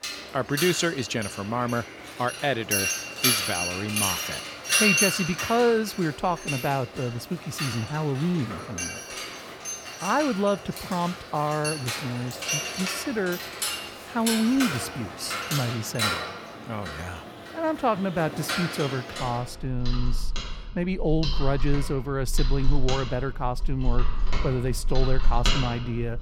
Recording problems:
machinery noise; loud; throughout; 1 dB below the speech

